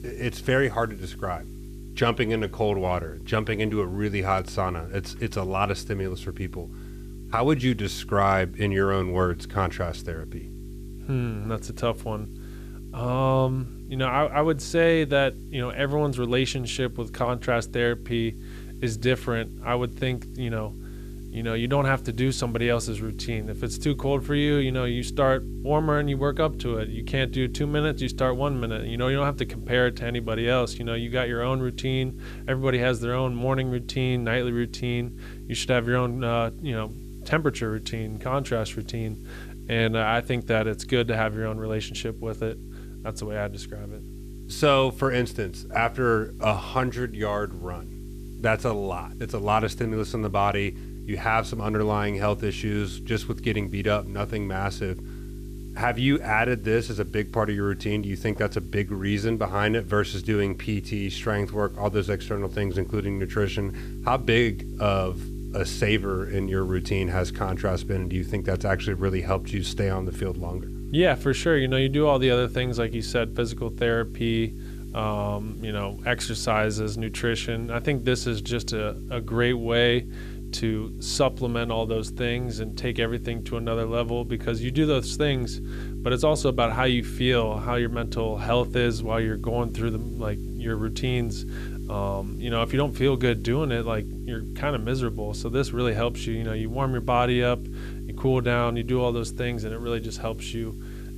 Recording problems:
electrical hum; noticeable; throughout; 50 Hz, 20 dB below the speech
hiss; faint; throughout; 30 dB below the speech

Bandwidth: 14.5 kHz